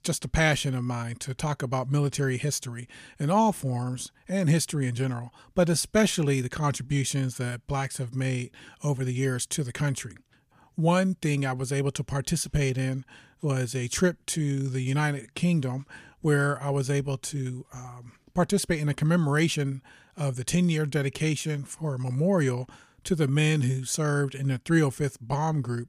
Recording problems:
none

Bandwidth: 15 kHz